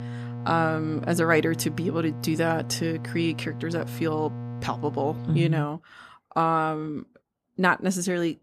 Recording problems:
electrical hum; noticeable; until 5.5 s; 60 Hz, 15 dB below the speech

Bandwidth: 14 kHz